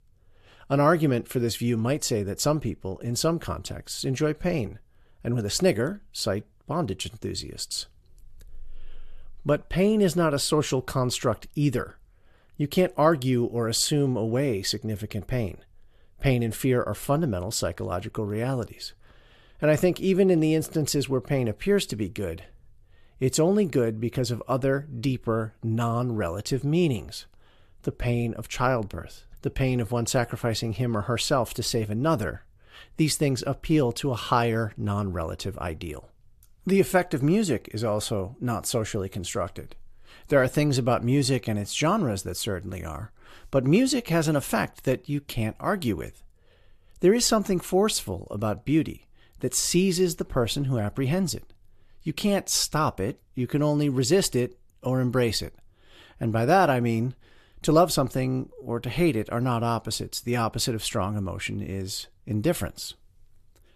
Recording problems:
none

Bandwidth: 14 kHz